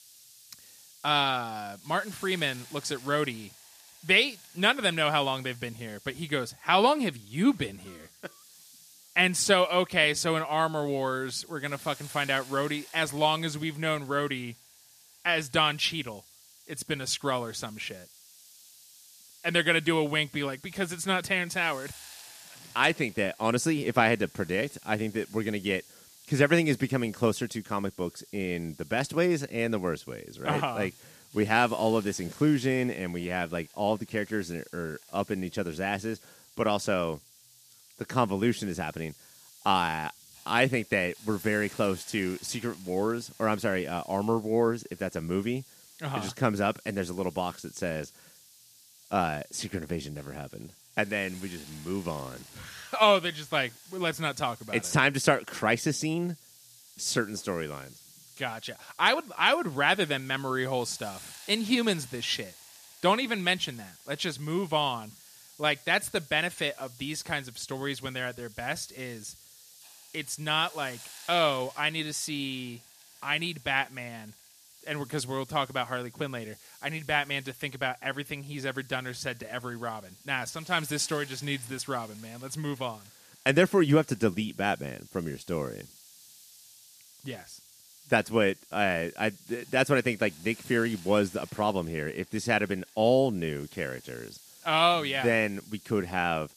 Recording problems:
hiss; faint; throughout; 20 dB below the speech

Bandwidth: 14.5 kHz